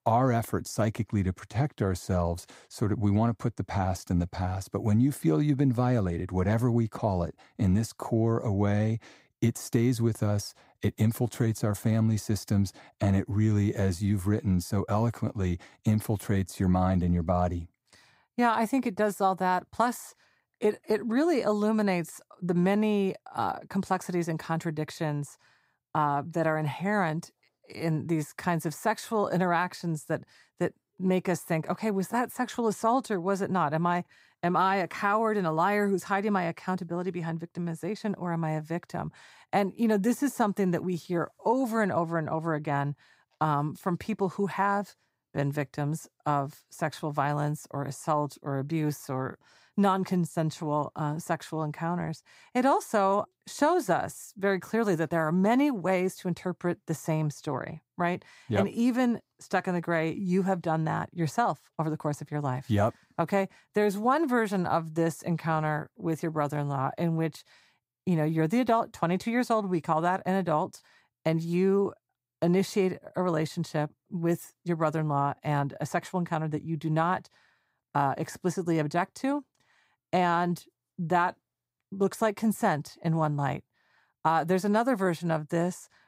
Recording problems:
none

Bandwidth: 15.5 kHz